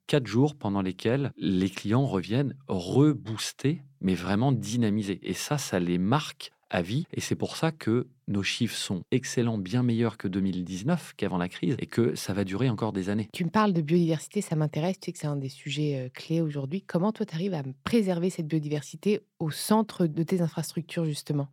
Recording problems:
none

